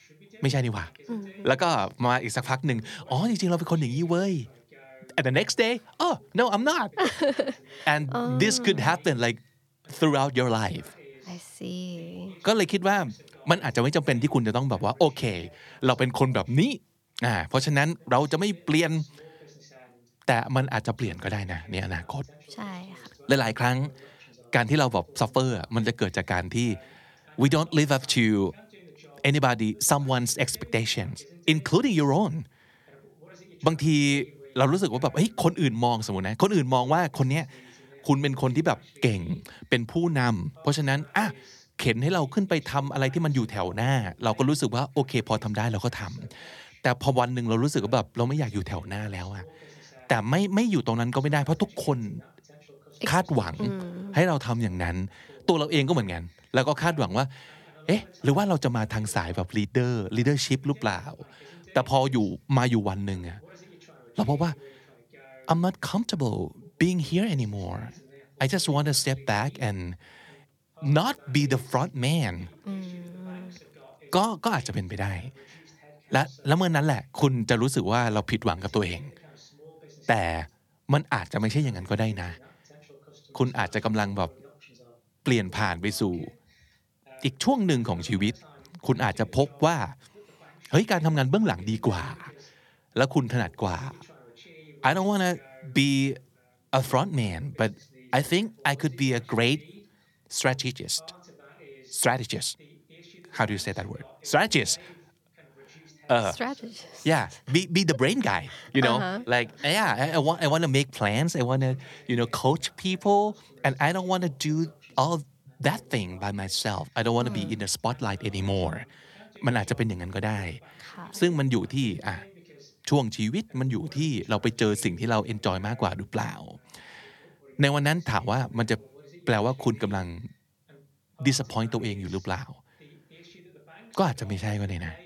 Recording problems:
voice in the background; faint; throughout; 25 dB below the speech

